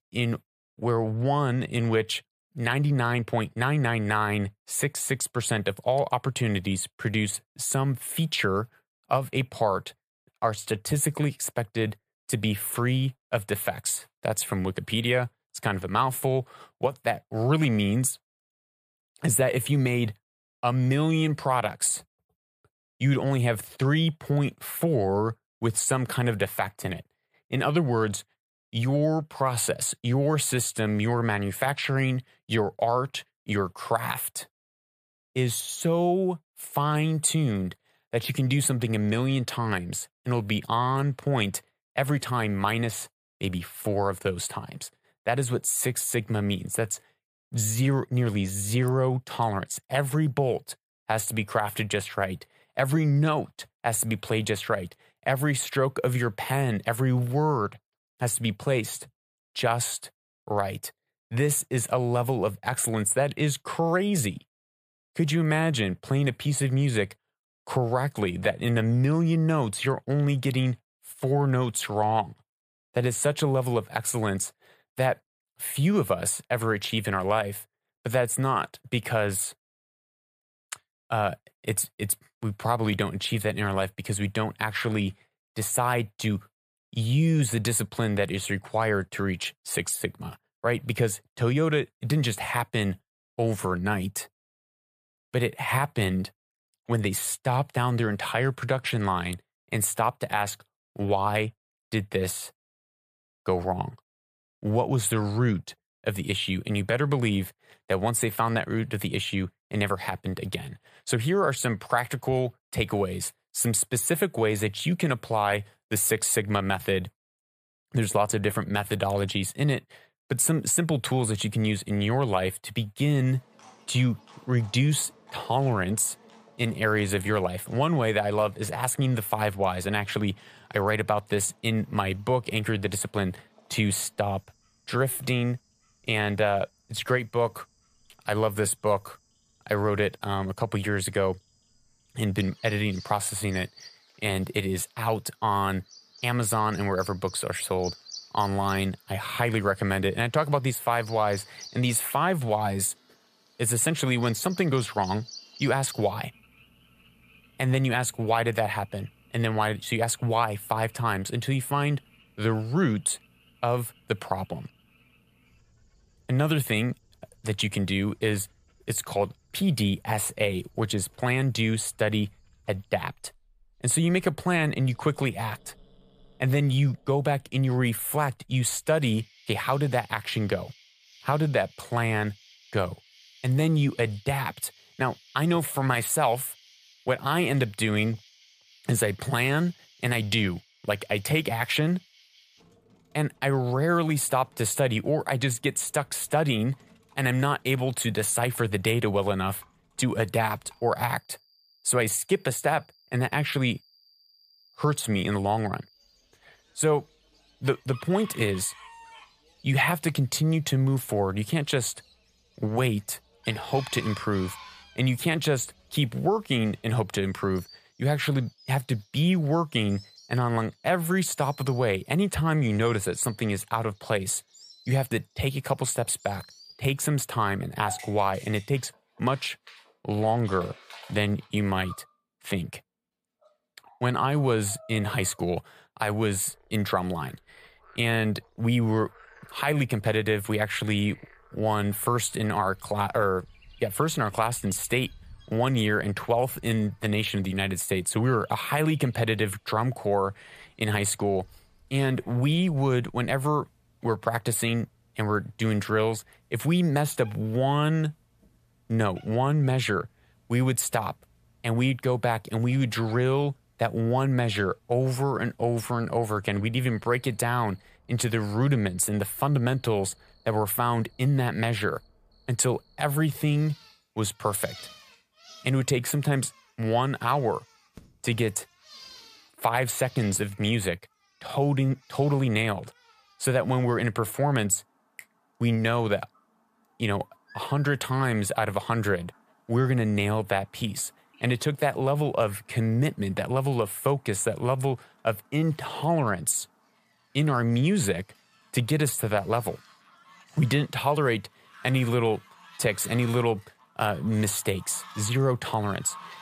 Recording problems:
animal sounds; faint; from 2:03 on; 25 dB below the speech

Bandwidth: 14.5 kHz